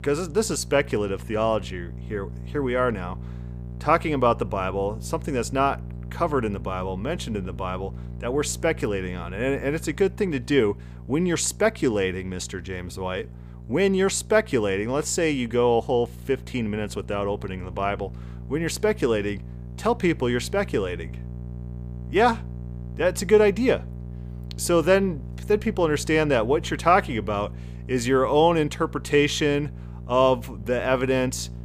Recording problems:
electrical hum; faint; throughout; 60 Hz, 25 dB below the speech

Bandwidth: 15 kHz